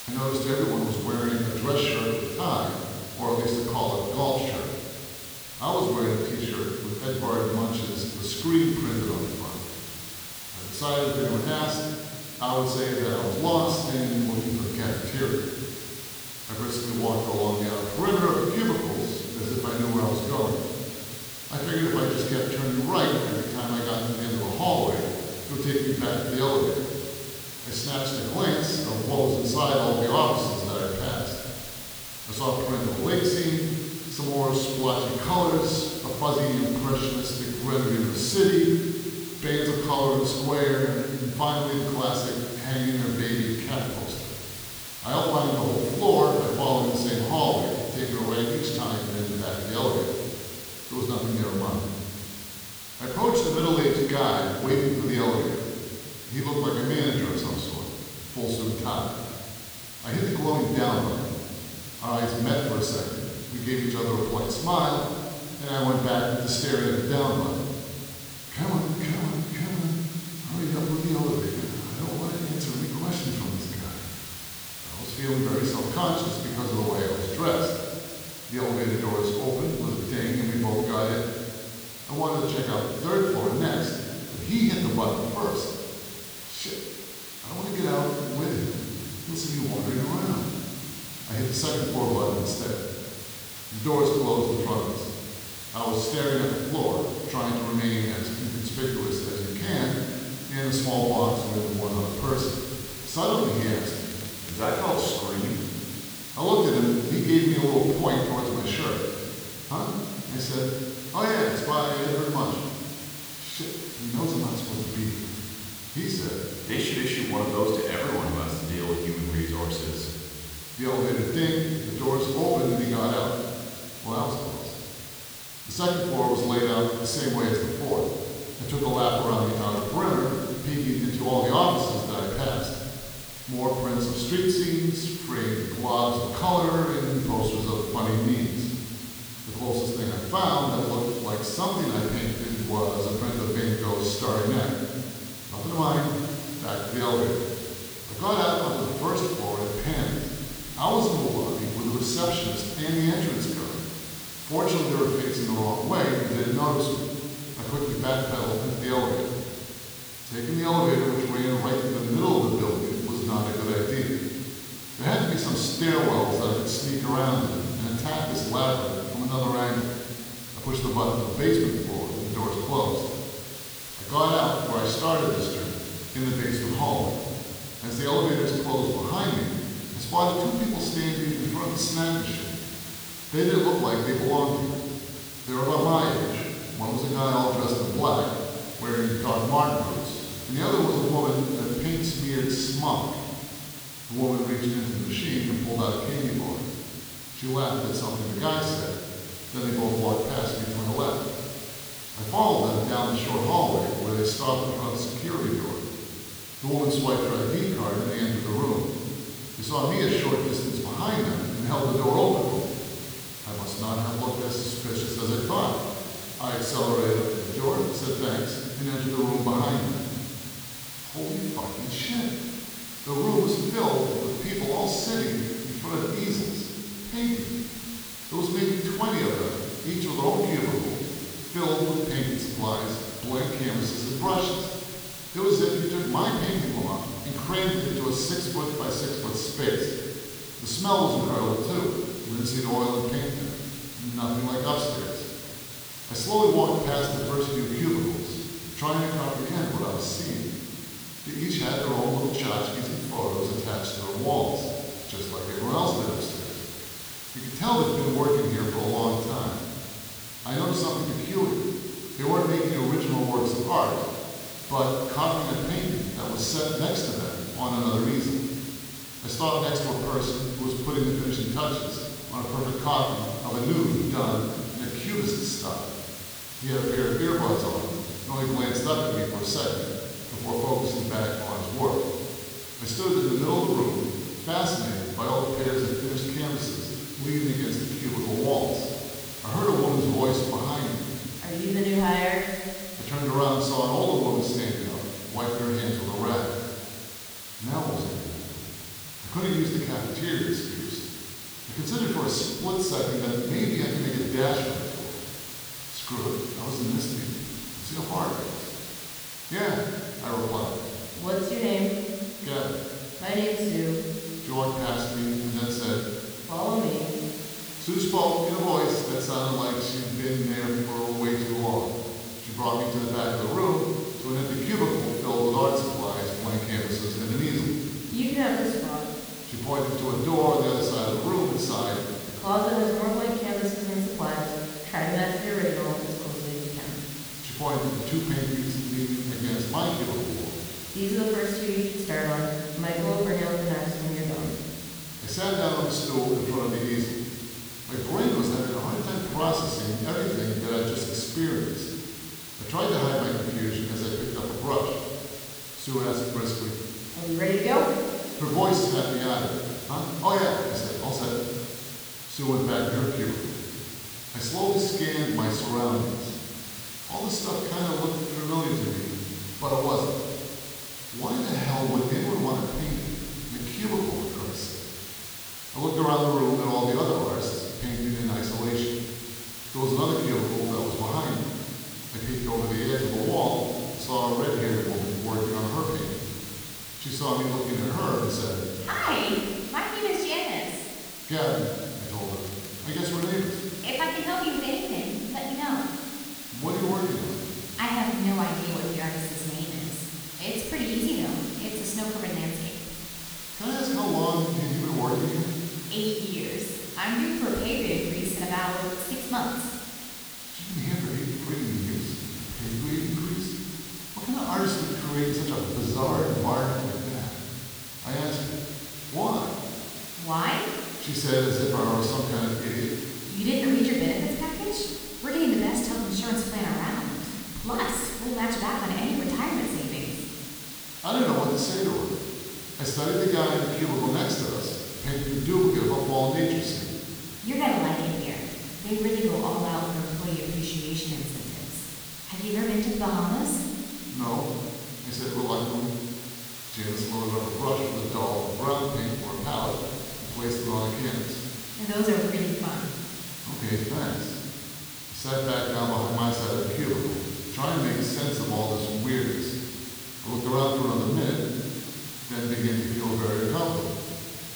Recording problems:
room echo; strong; dies away in 1.7 s
off-mic speech; far
hiss; loud; throughout; 10 dB below the speech
crackling; faint; from 1:43 to 1:45, from 2:09 to 2:10 and from 6:32 to 6:34; 20 dB below the speech

